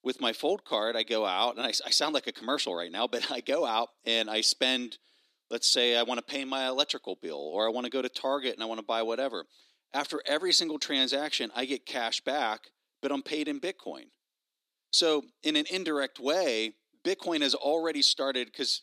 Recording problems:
thin; somewhat; fading below 250 Hz

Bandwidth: 14 kHz